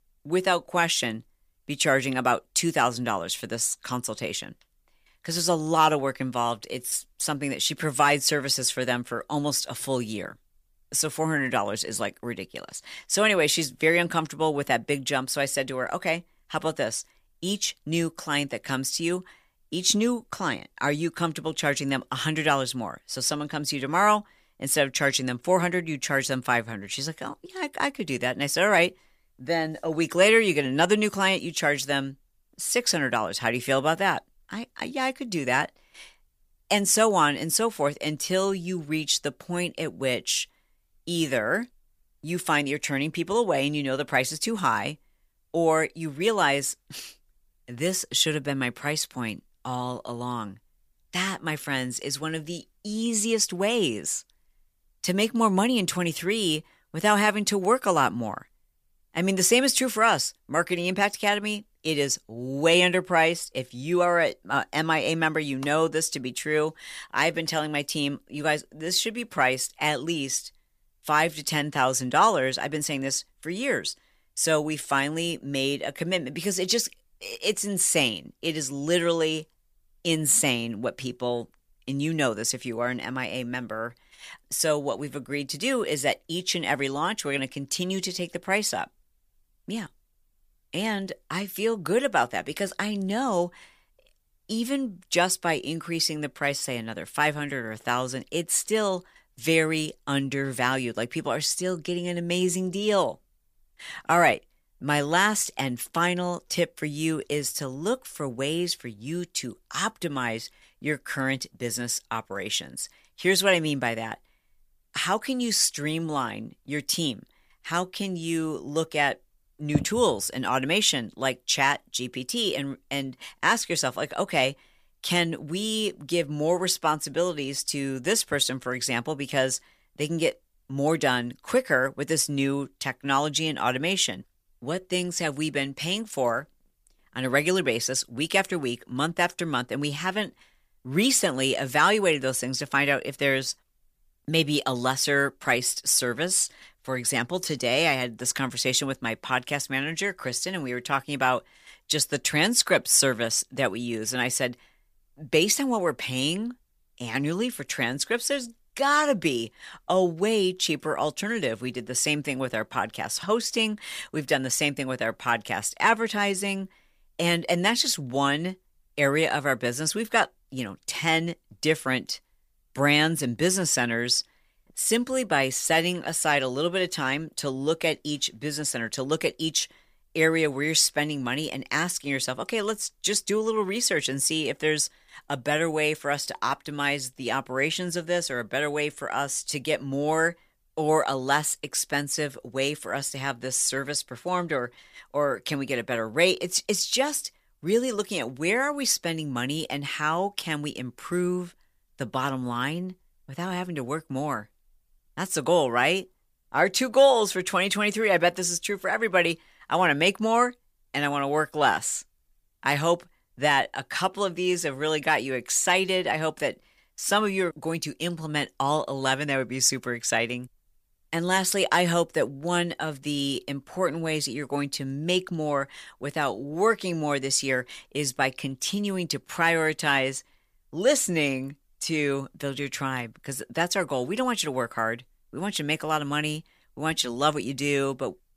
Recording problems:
none

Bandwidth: 15 kHz